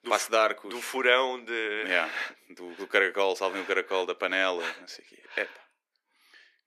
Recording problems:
thin; very; fading below 350 Hz

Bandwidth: 14.5 kHz